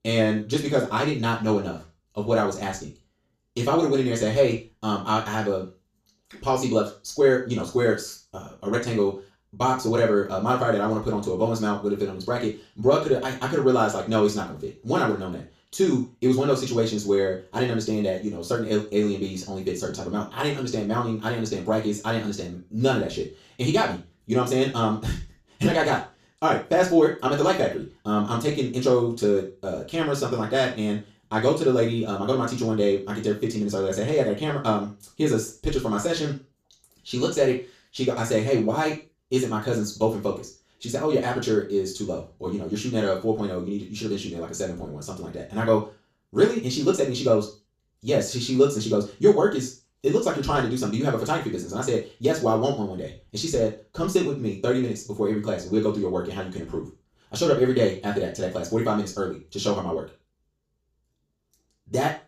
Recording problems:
off-mic speech; far
wrong speed, natural pitch; too fast; 1.5 times normal speed
room echo; slight; dies away in 0.3 s

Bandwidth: 14.5 kHz